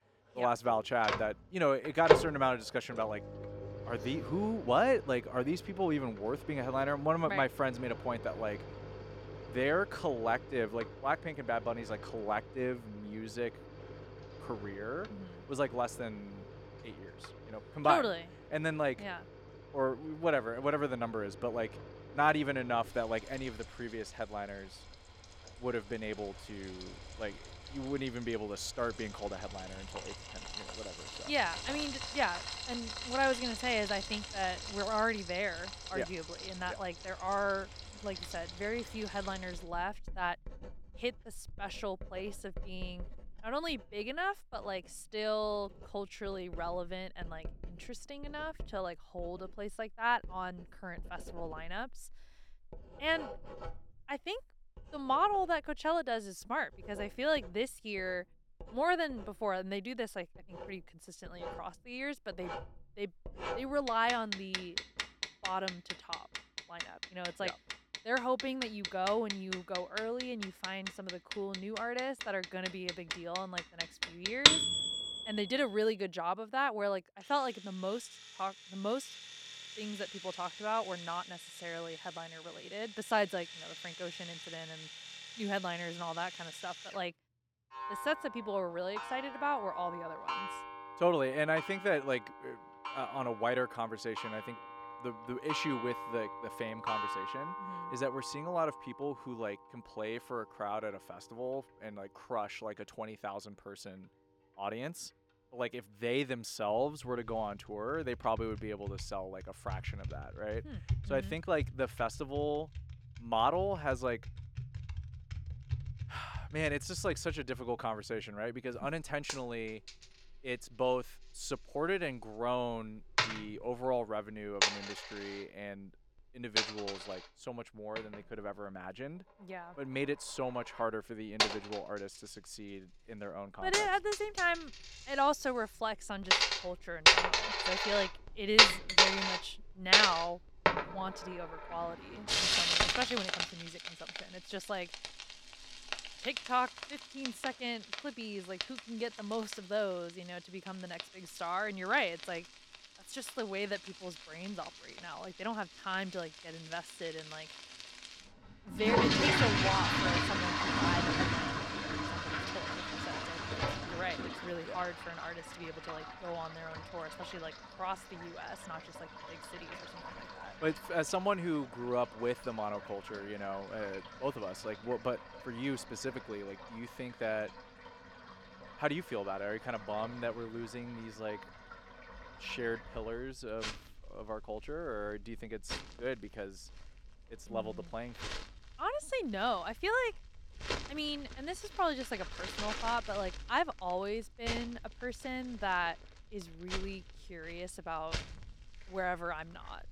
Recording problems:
household noises; very loud; throughout; 1 dB above the speech

